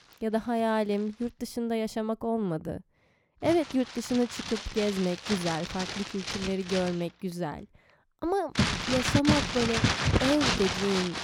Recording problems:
household noises; very loud; throughout; as loud as the speech

